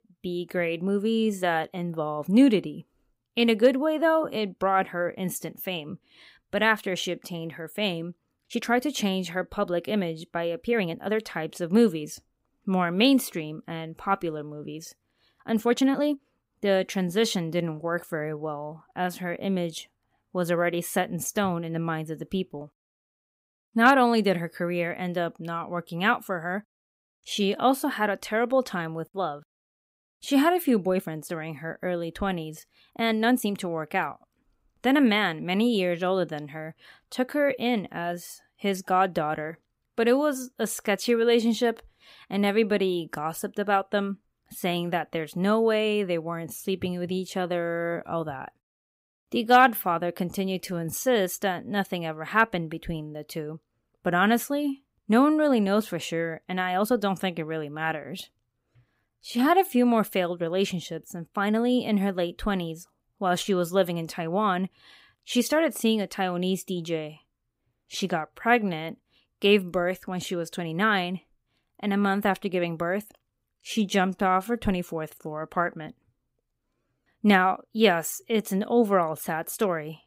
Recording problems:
uneven, jittery; strongly; from 8.5 s to 1:15

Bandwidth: 15.5 kHz